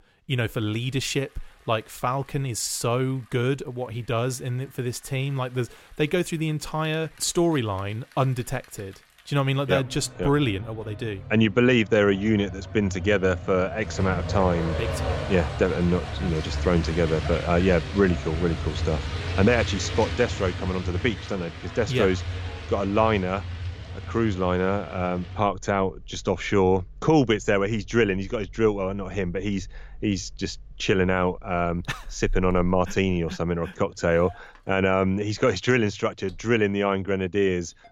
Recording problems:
traffic noise; loud; throughout; 9 dB below the speech

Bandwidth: 16 kHz